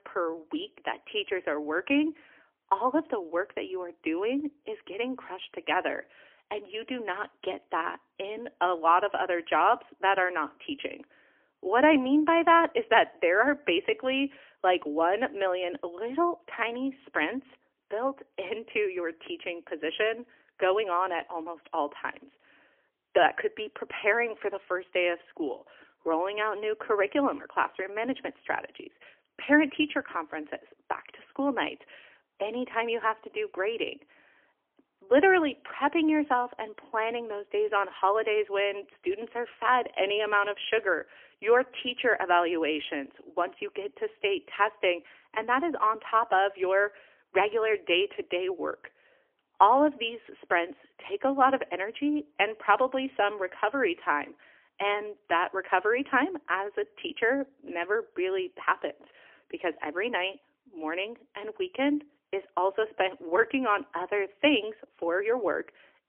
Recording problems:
phone-call audio; poor line; nothing above 3 kHz

